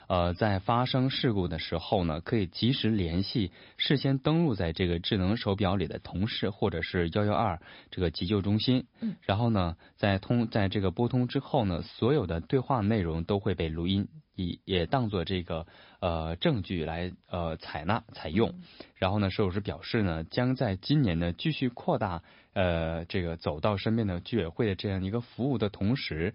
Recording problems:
high frequencies cut off; noticeable; nothing above 5 kHz
garbled, watery; slightly

